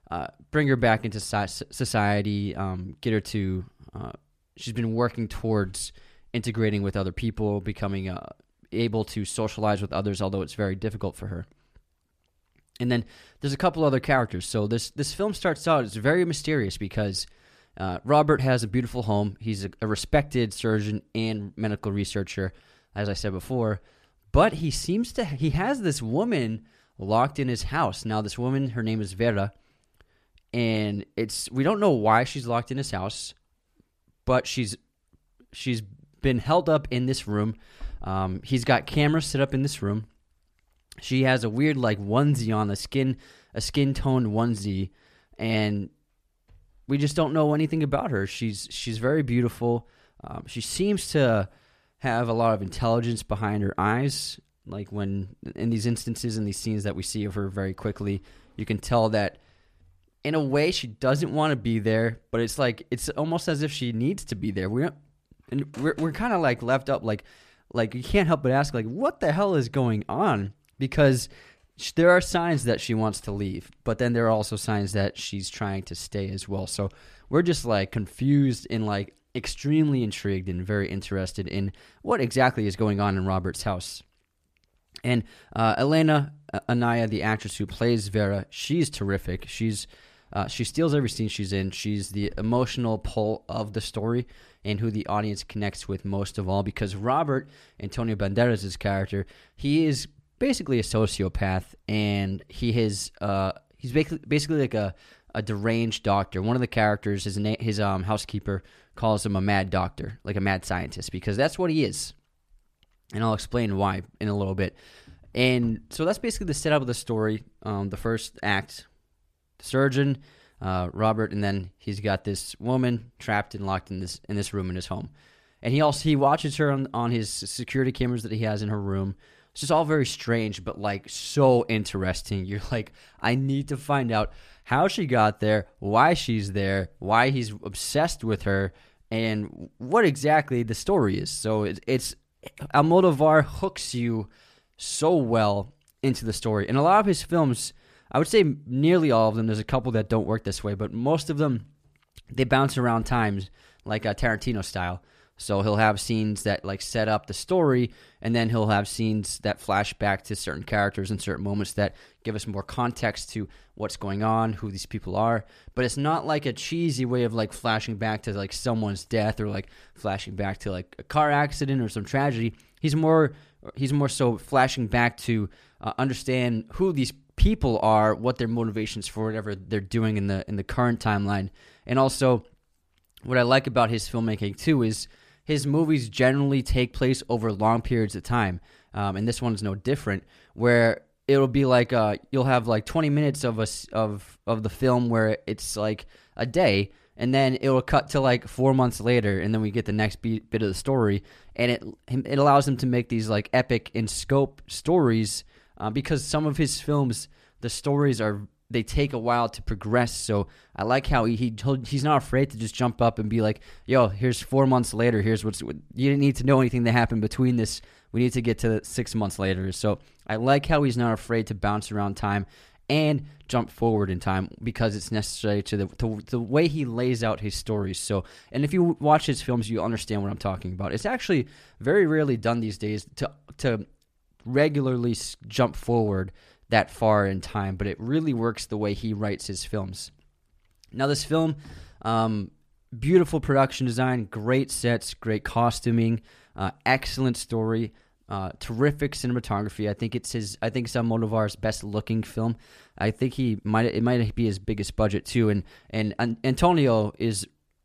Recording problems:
none

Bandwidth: 14.5 kHz